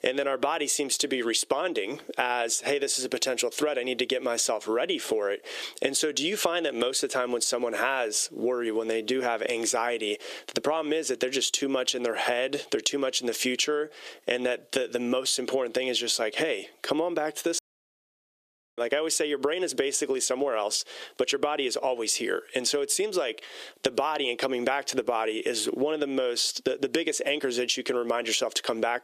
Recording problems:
thin; somewhat; fading below 400 Hz
squashed, flat; somewhat
audio cutting out; at 18 s for 1 s

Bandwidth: 14.5 kHz